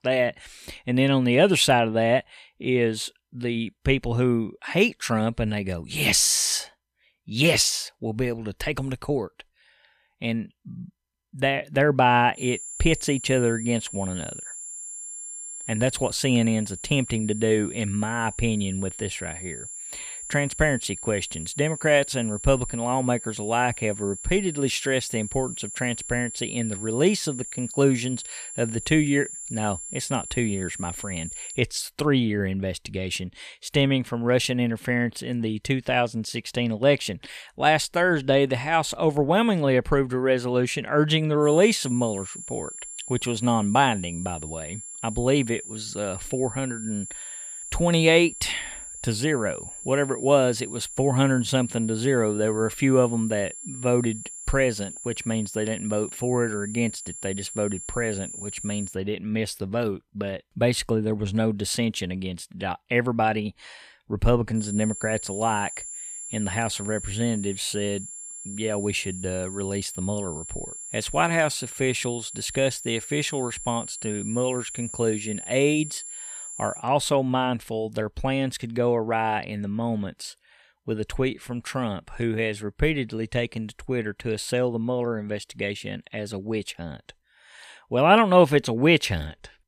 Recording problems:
high-pitched whine; noticeable; from 12 to 32 s, from 41 to 59 s and from 1:05 to 1:17; 7.5 kHz, 10 dB below the speech

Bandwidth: 14.5 kHz